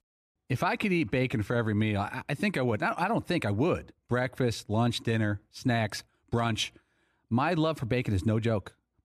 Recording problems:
none

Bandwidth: 14.5 kHz